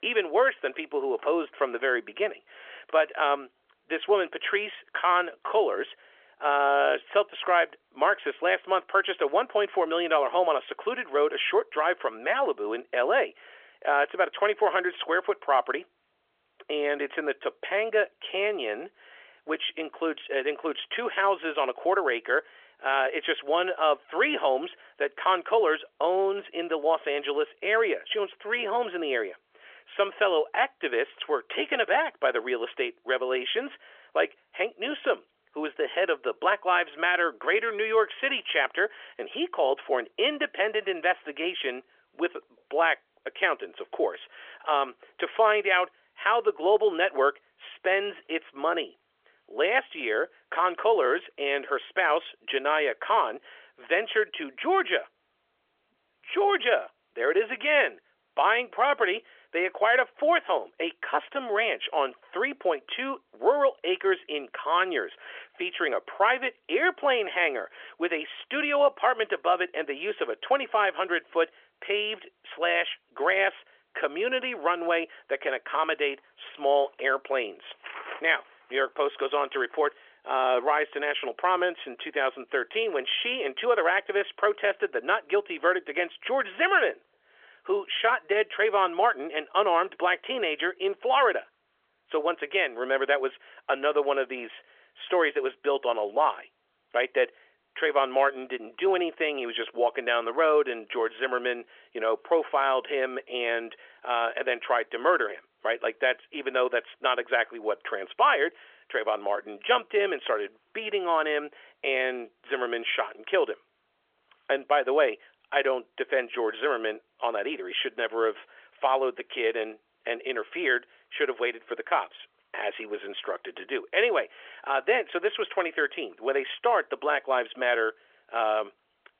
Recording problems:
phone-call audio; nothing above 3.5 kHz

